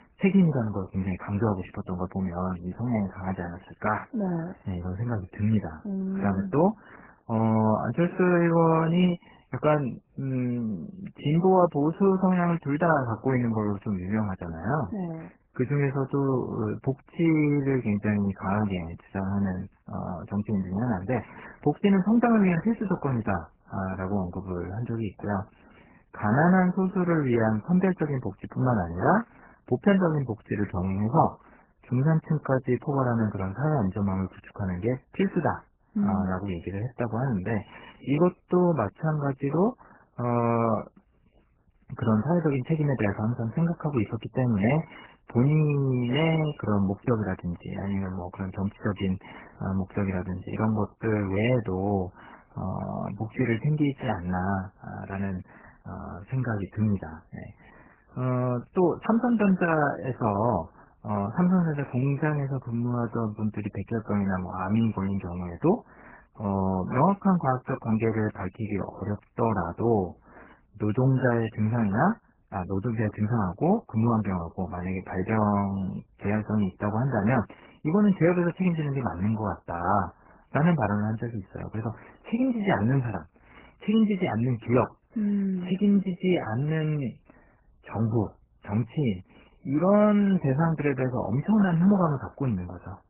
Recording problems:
garbled, watery; badly; nothing above 3 kHz

